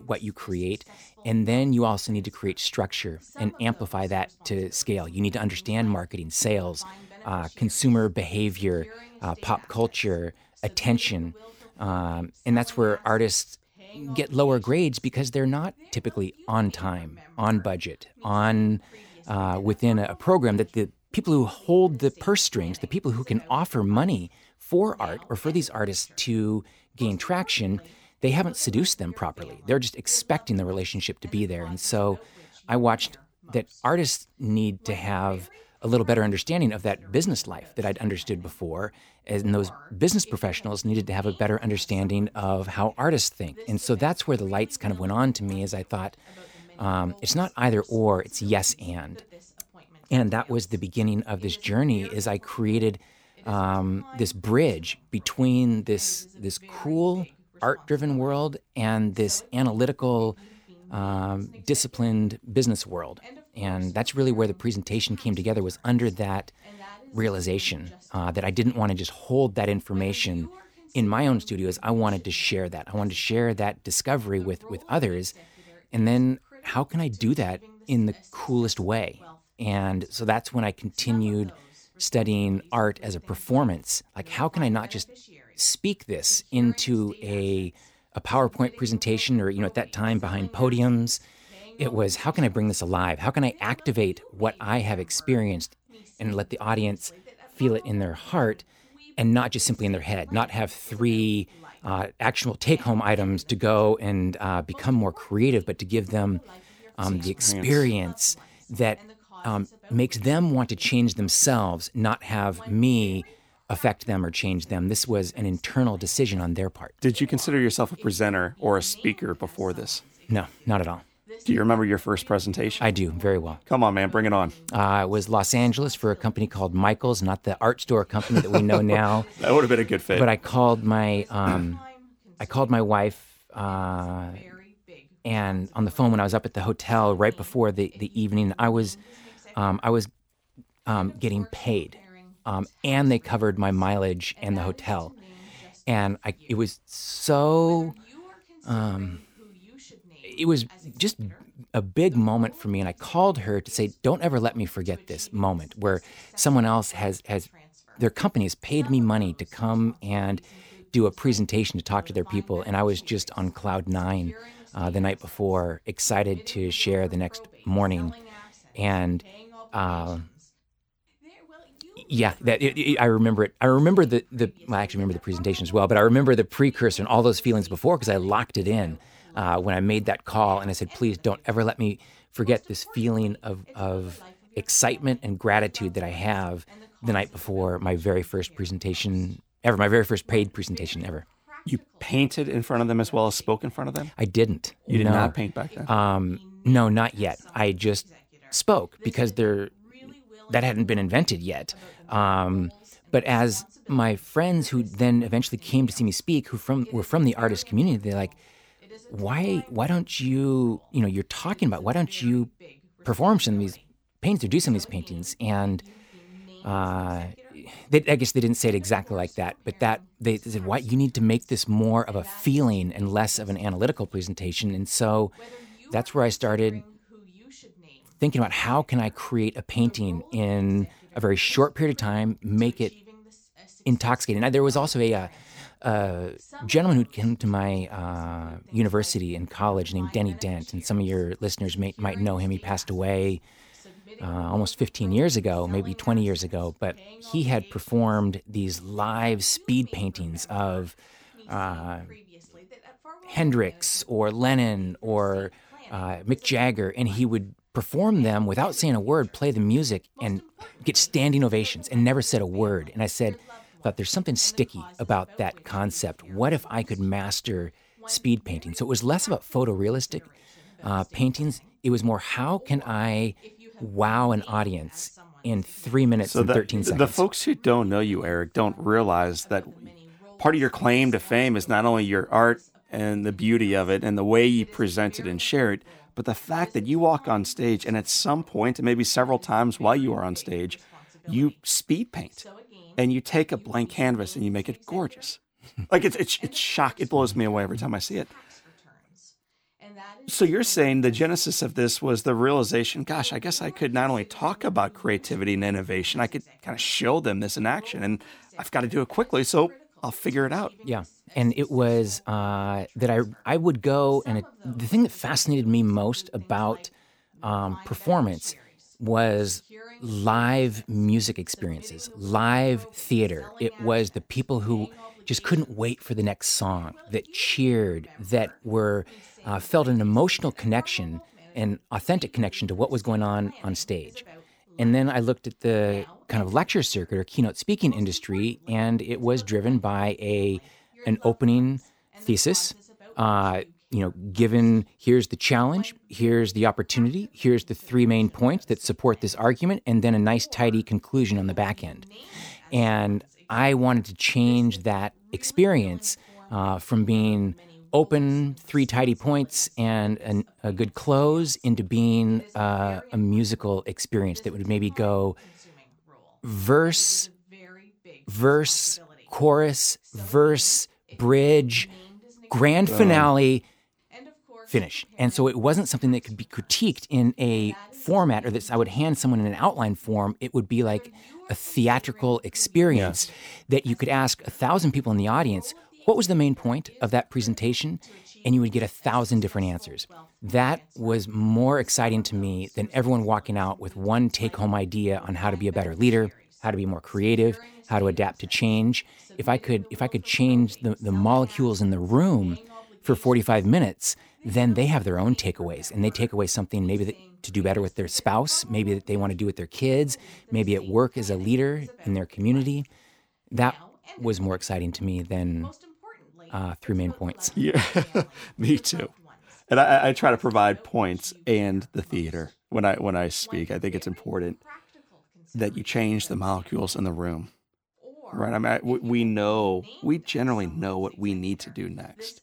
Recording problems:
voice in the background; faint; throughout; 25 dB below the speech

